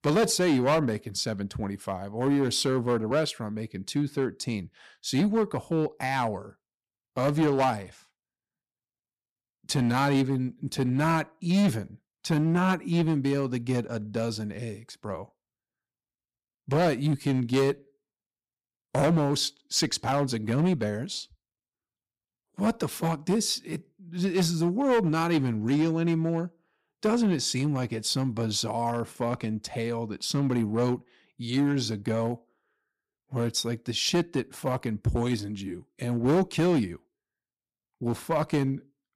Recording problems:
distortion; slight; 5% of the sound clipped

